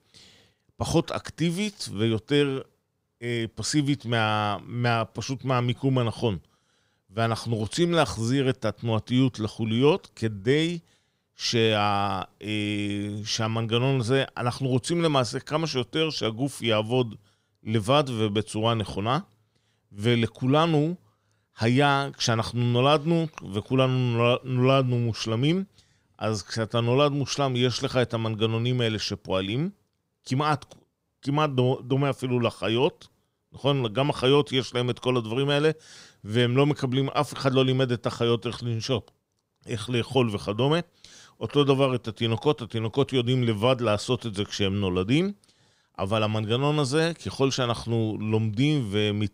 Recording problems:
none

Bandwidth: 15.5 kHz